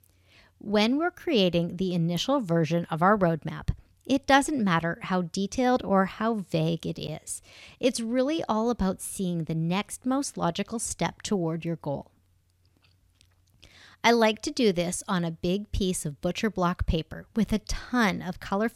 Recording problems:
none

